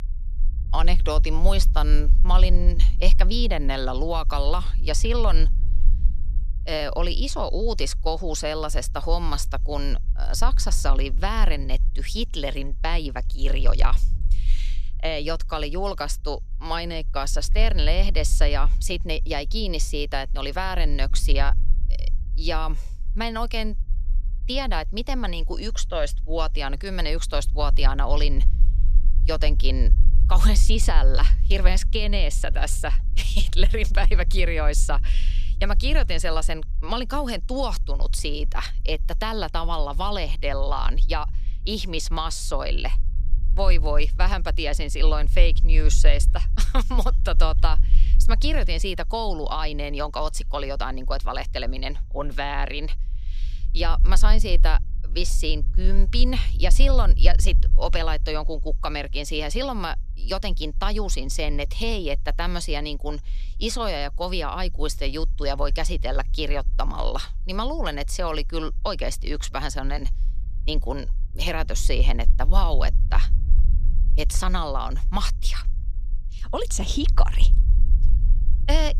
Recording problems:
low rumble; faint; throughout; 20 dB below the speech

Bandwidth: 14.5 kHz